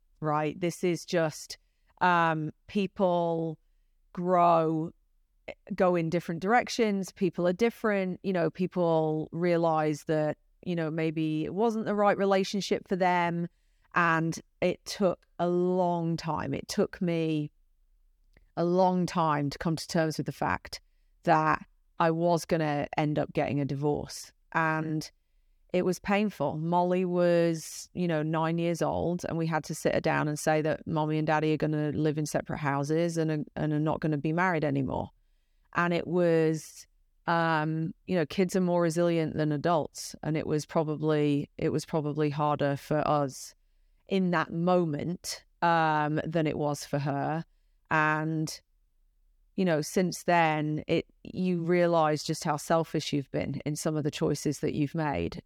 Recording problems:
none

